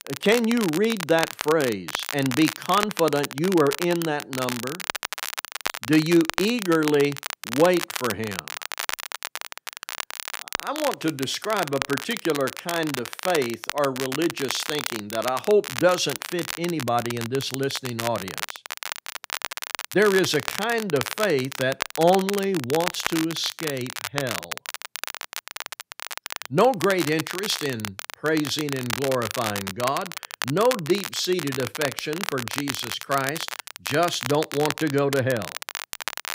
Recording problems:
crackle, like an old record; loud; 7 dB below the speech

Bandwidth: 15.5 kHz